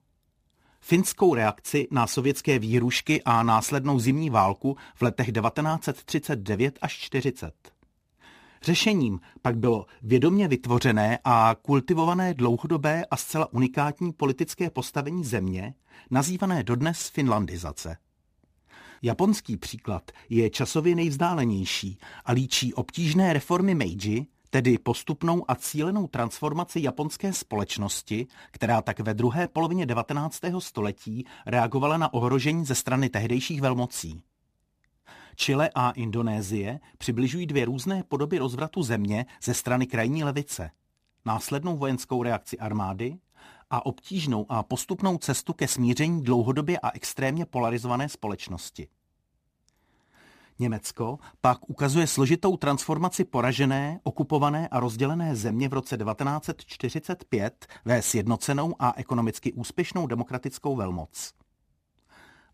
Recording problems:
none

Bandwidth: 15 kHz